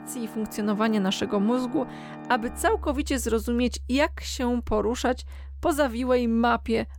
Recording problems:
background music; noticeable; throughout; 15 dB below the speech

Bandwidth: 17 kHz